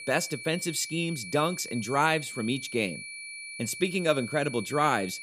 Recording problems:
high-pitched whine; loud; throughout; 2.5 kHz, 10 dB below the speech

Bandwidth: 15 kHz